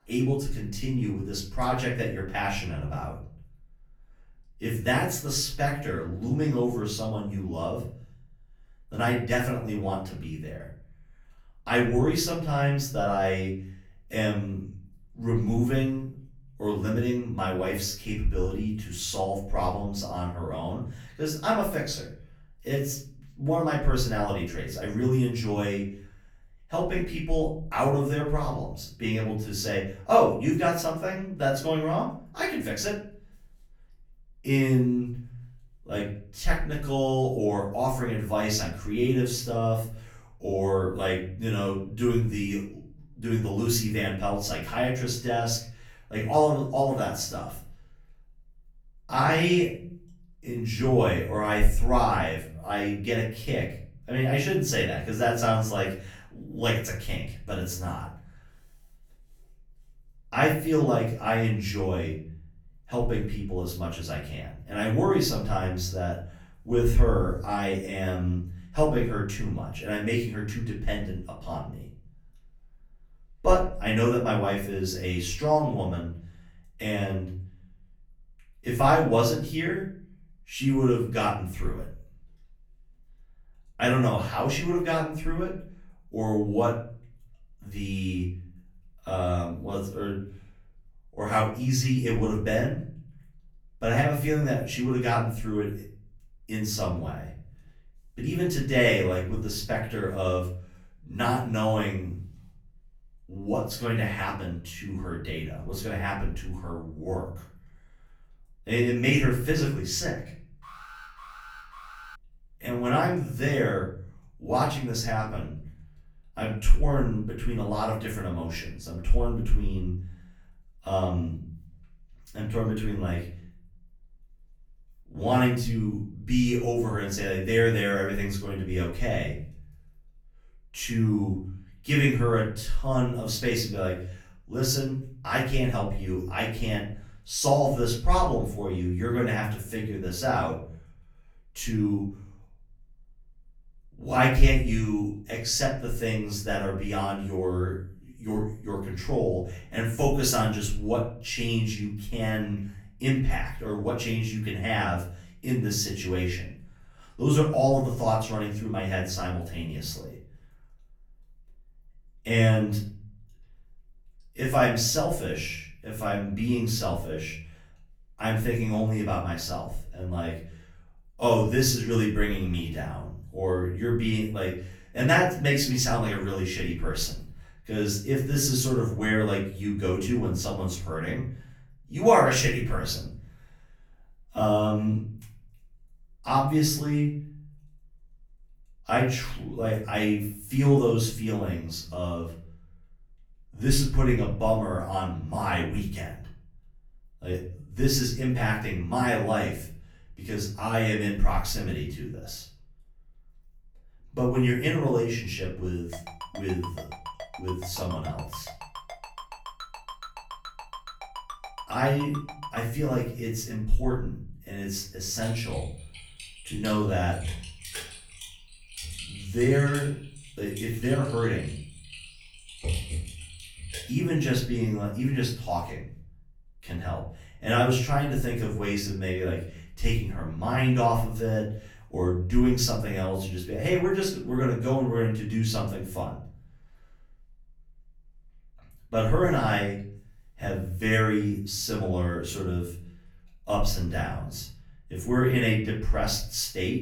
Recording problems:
off-mic speech; far
room echo; slight; dies away in 0.6 s
alarm; faint; from 1:51 to 1:52; peak 15 dB below the speech
phone ringing; faint; from 3:26 to 3:33; peak 10 dB below the speech
keyboard typing; noticeable; from 3:35 to 3:44; peak 3 dB below the speech

